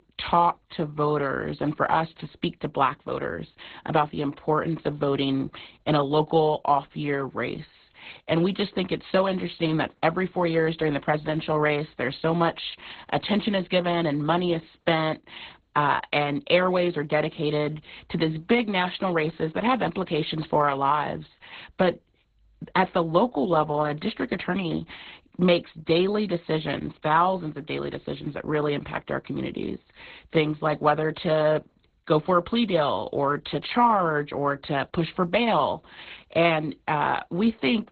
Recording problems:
garbled, watery; badly; nothing above 4 kHz

